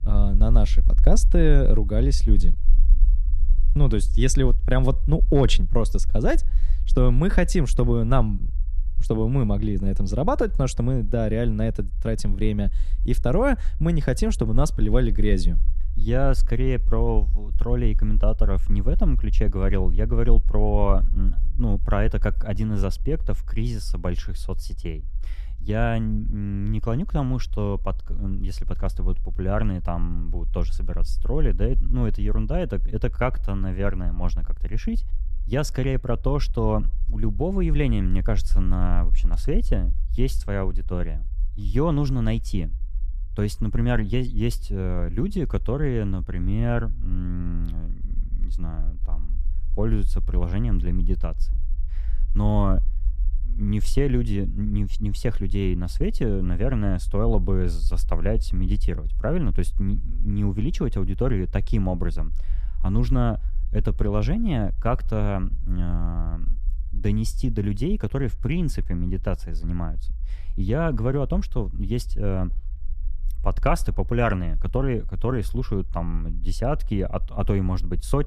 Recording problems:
low rumble; faint; throughout; 25 dB below the speech

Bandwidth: 14.5 kHz